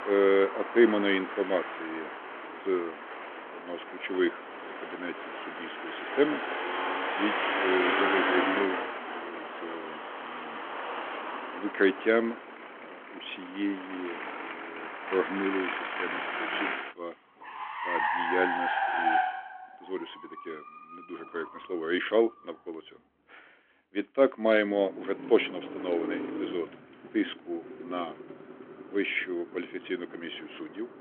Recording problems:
phone-call audio
traffic noise; loud; throughout; 3 dB below the speech

